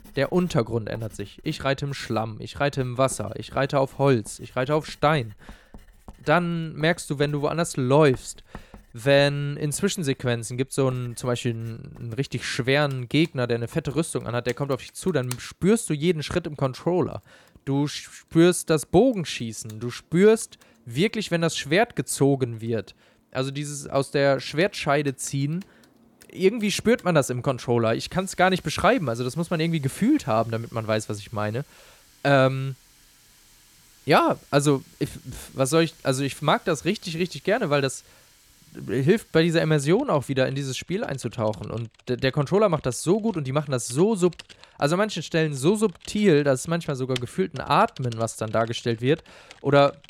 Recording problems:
household noises; faint; throughout; 25 dB below the speech

